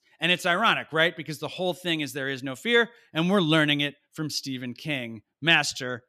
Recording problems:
none

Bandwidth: 14.5 kHz